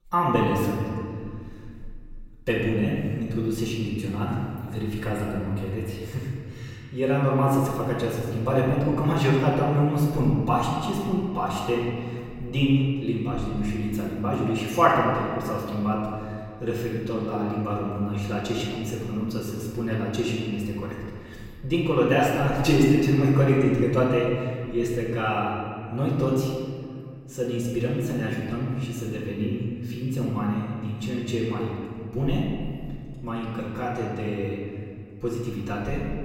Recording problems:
off-mic speech; far
room echo; noticeable; dies away in 2 s

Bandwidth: 16 kHz